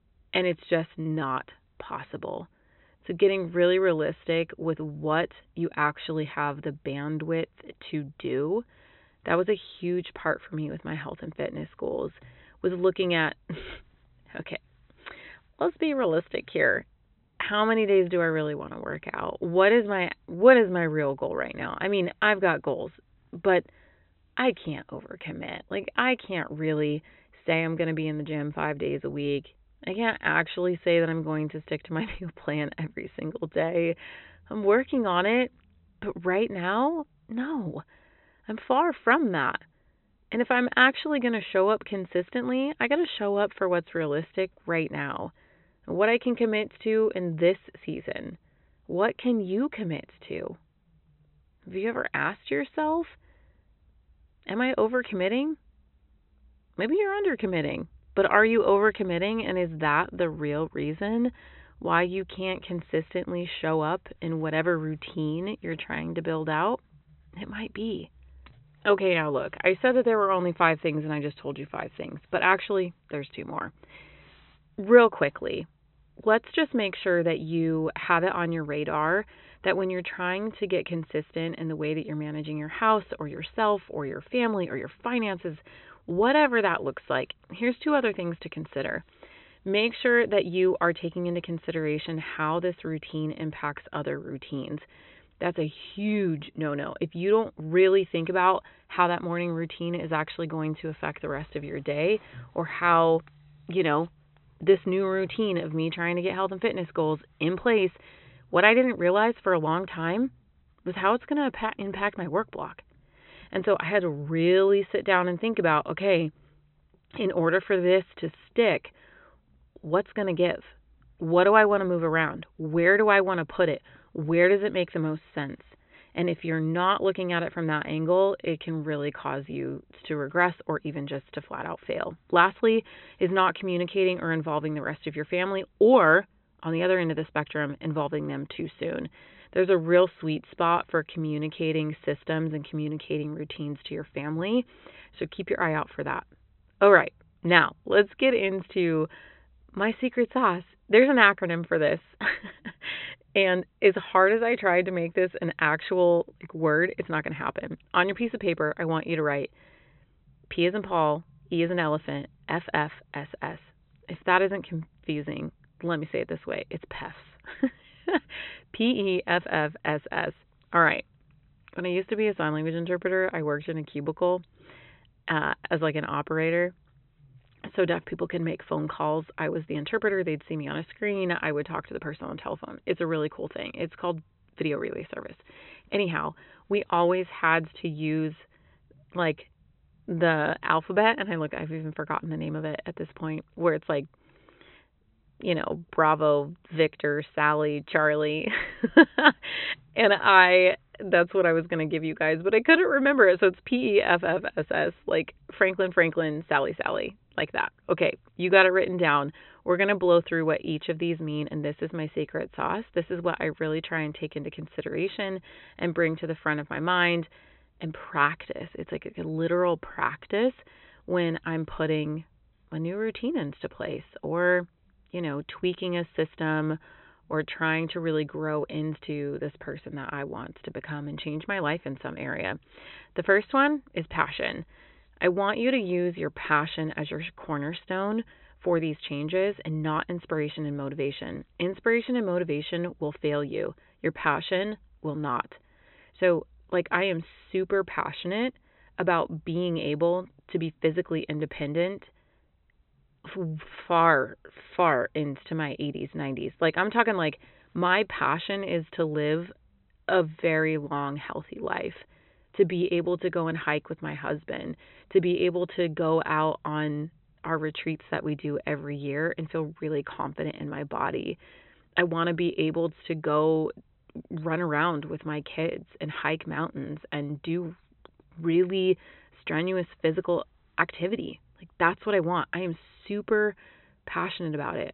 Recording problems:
high frequencies cut off; severe; nothing above 4 kHz

